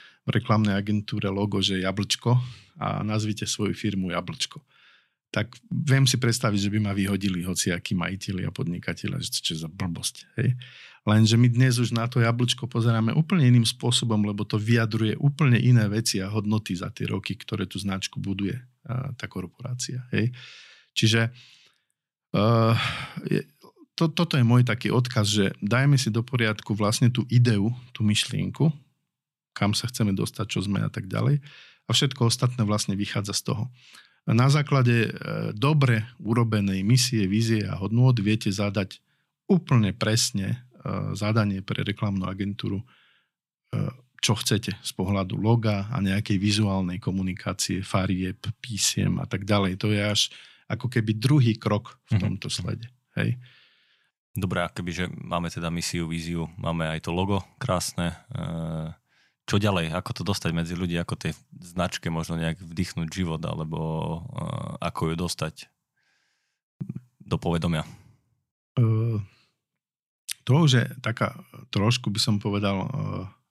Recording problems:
none

